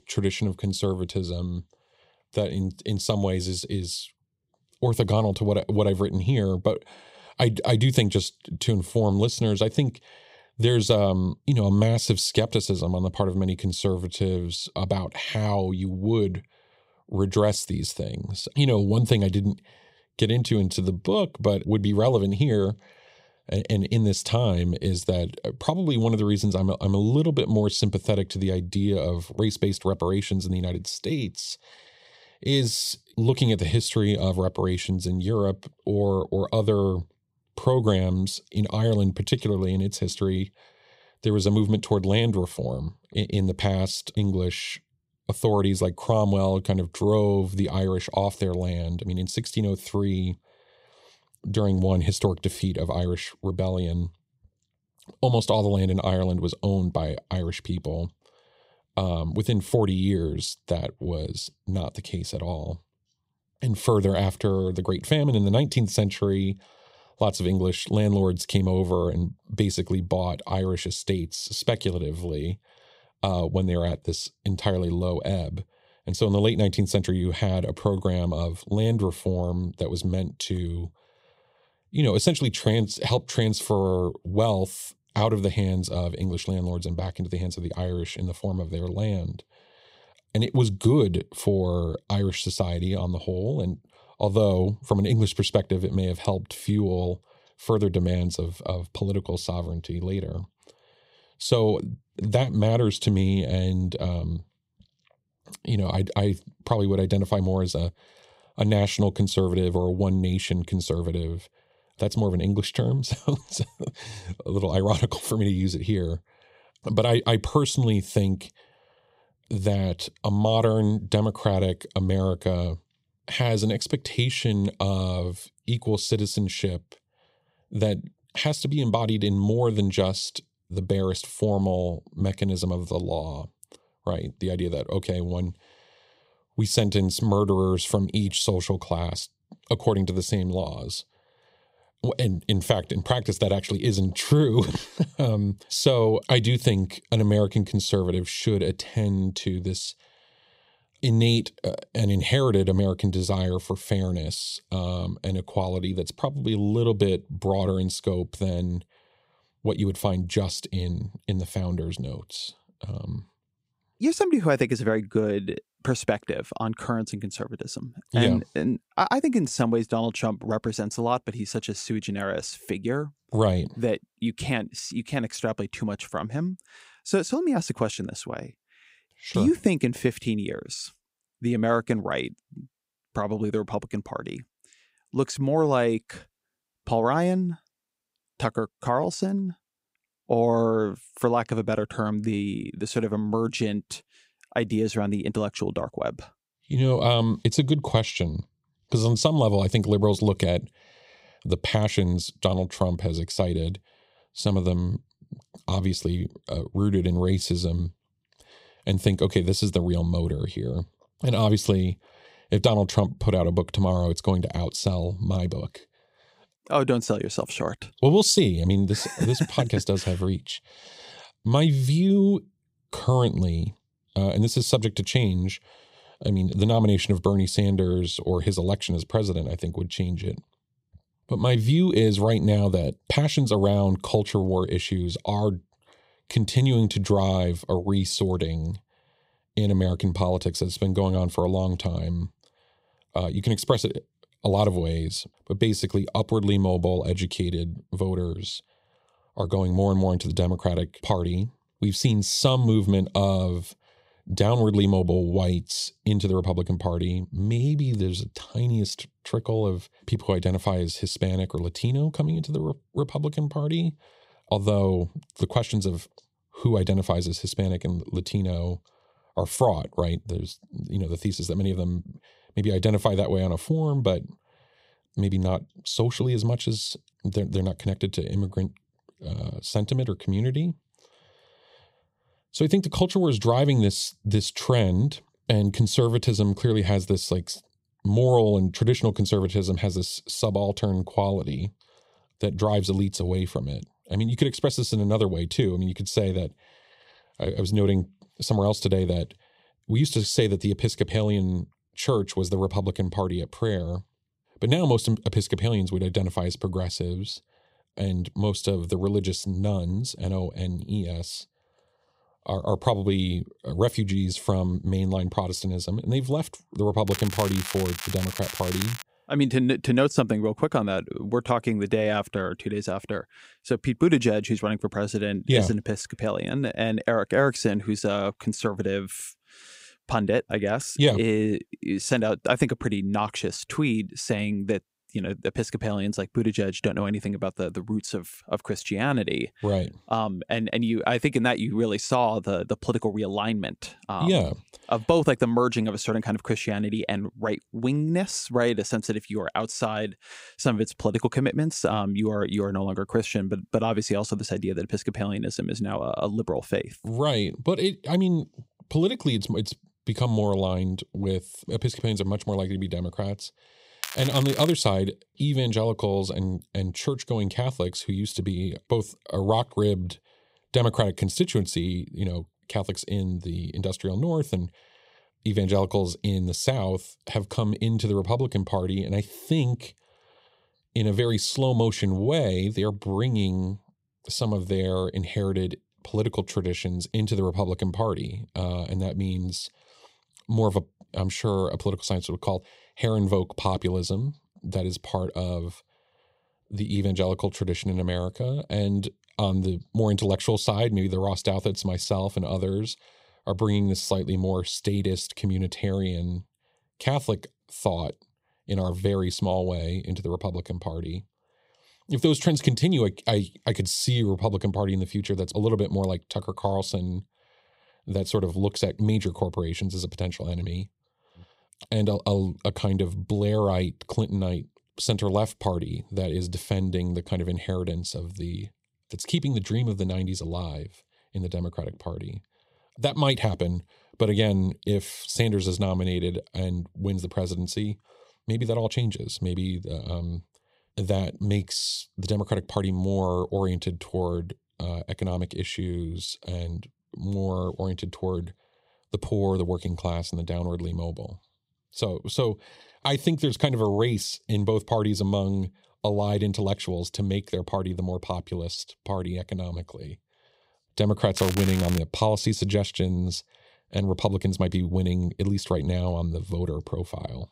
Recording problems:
crackling; loud; from 5:17 to 5:19, at 6:04 and at 7:41; 9 dB below the speech

